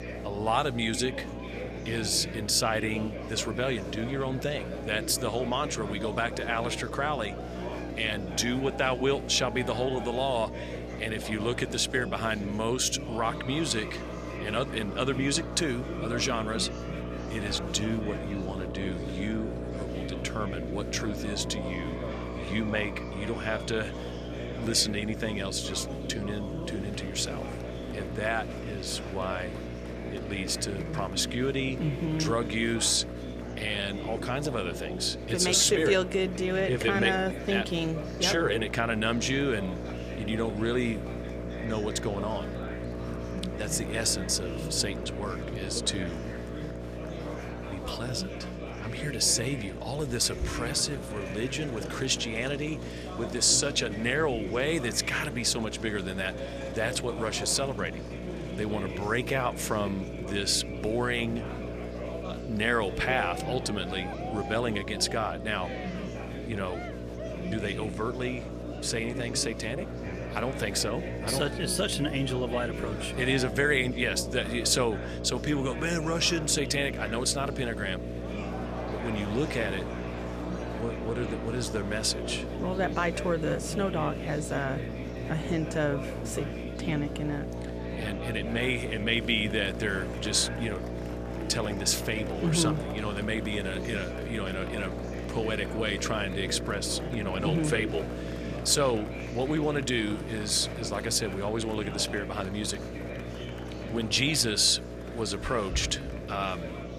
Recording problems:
electrical hum; noticeable; throughout; 60 Hz, 10 dB below the speech
murmuring crowd; noticeable; throughout; 10 dB below the speech

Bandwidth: 14.5 kHz